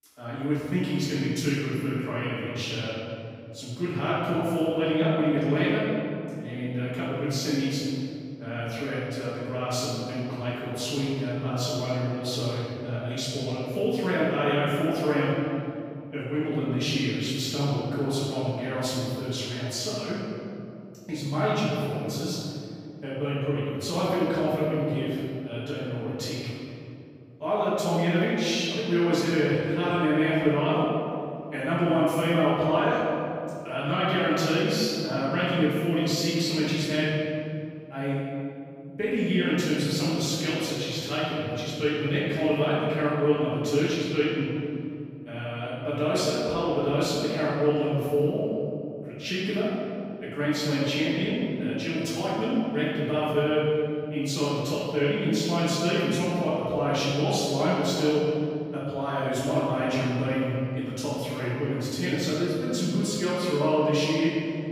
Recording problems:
room echo; strong; dies away in 2.6 s
off-mic speech; far

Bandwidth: 15.5 kHz